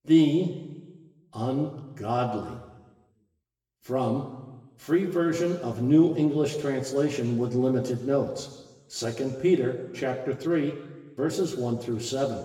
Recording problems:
room echo; slight; dies away in 1.2 s
off-mic speech; somewhat distant

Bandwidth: 17 kHz